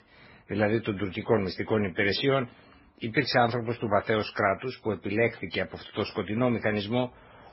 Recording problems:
garbled, watery; badly; nothing above 5.5 kHz

